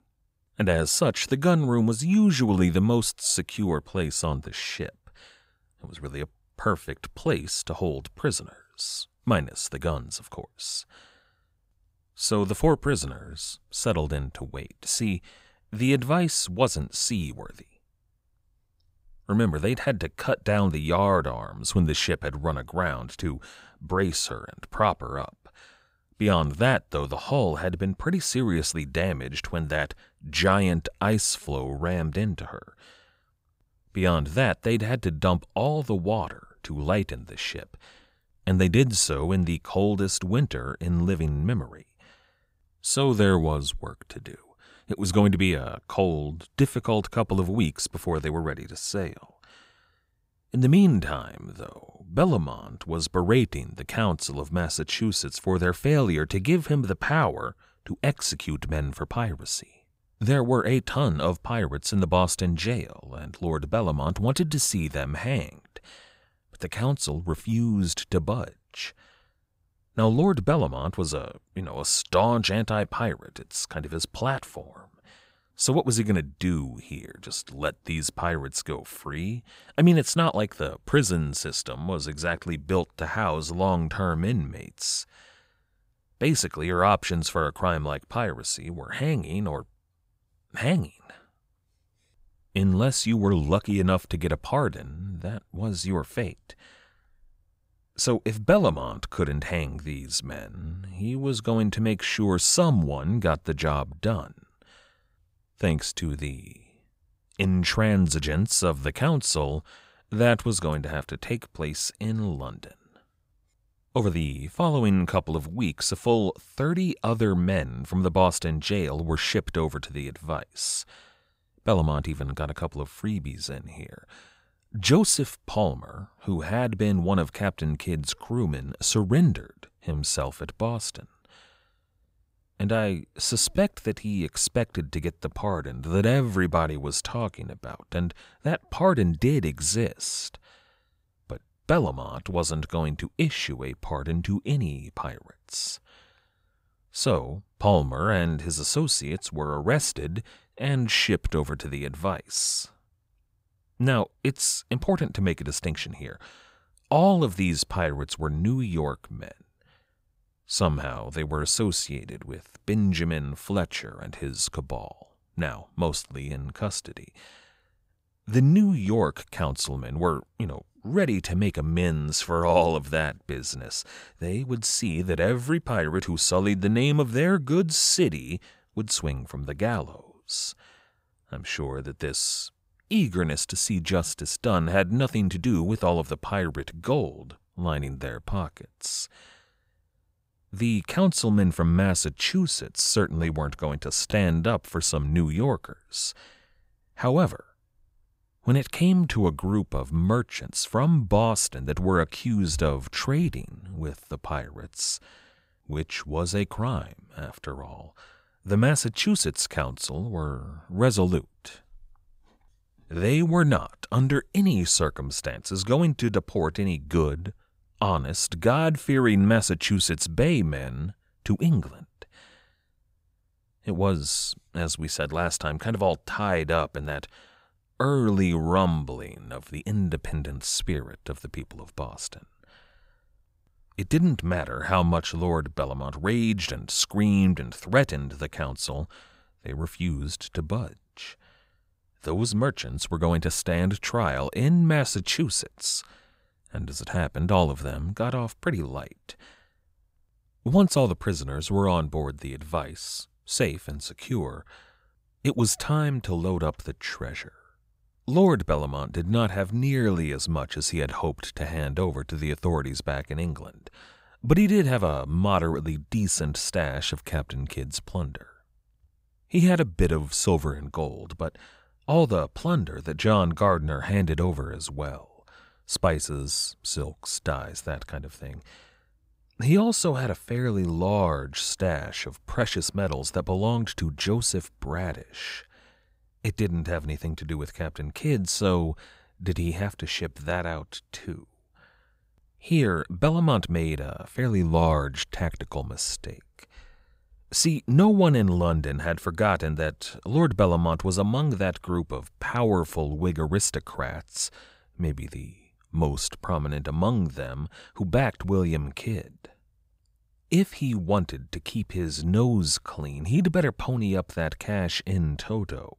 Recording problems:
none

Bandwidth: 15.5 kHz